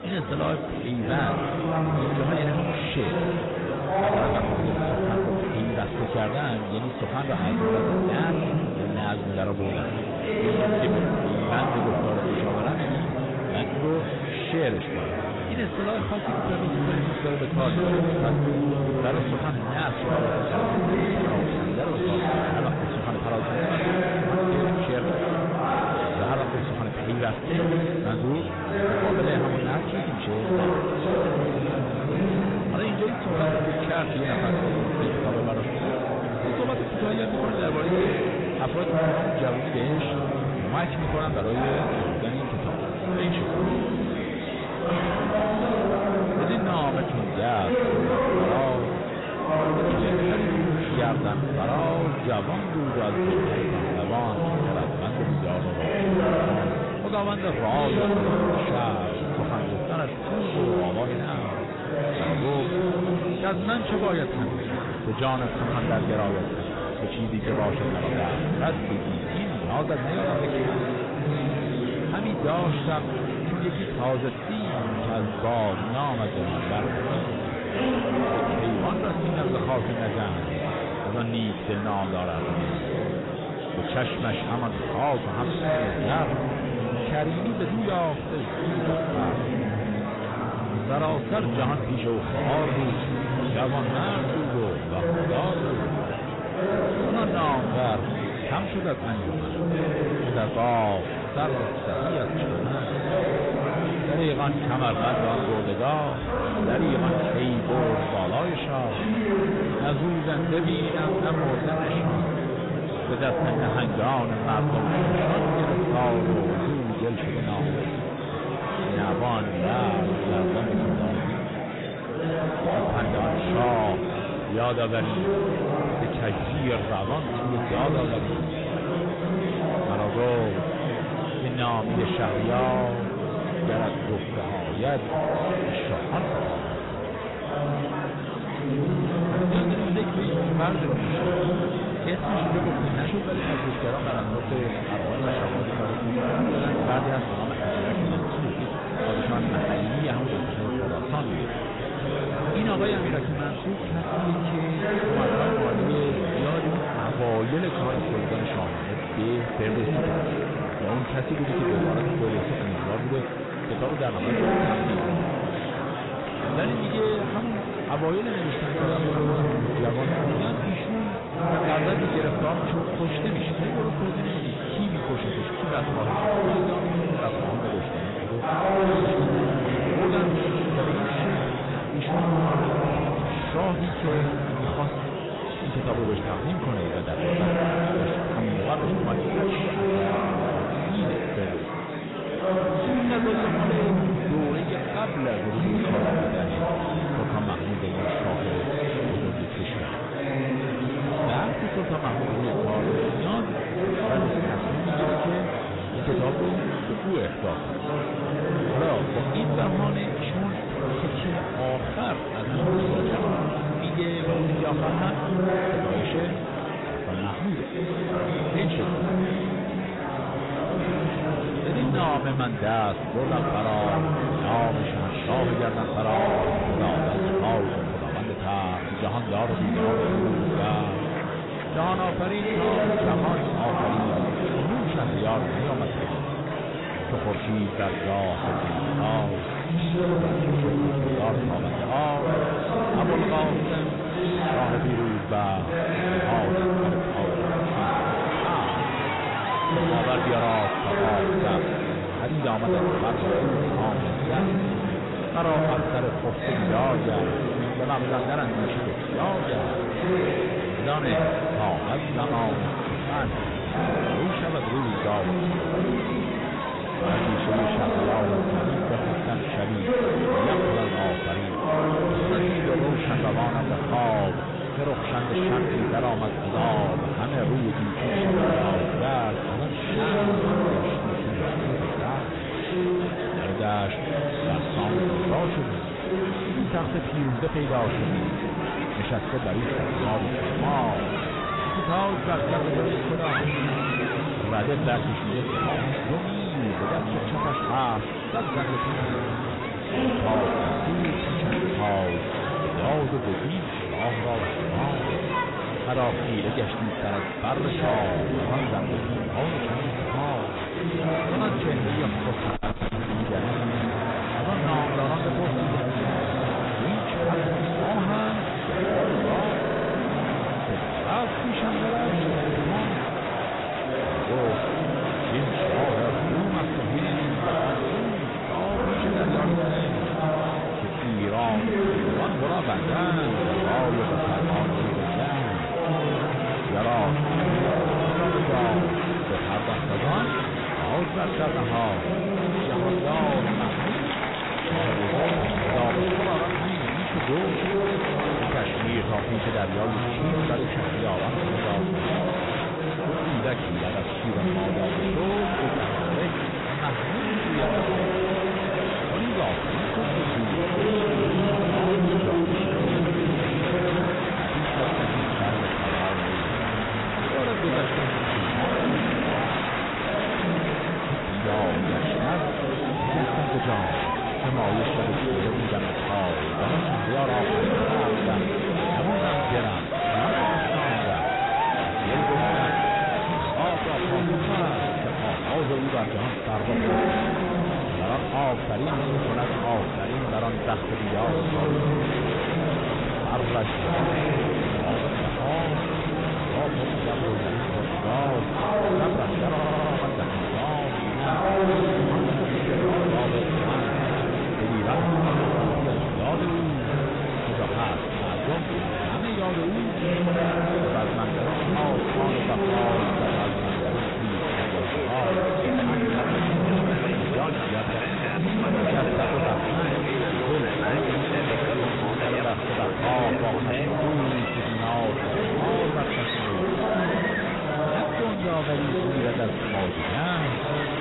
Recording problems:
garbled, watery; badly; nothing above 4 kHz
distortion; slight; 9 dB below the speech
murmuring crowd; very loud; throughout; 2 dB above the speech
audio stuttering; at 5:20 and at 6:40

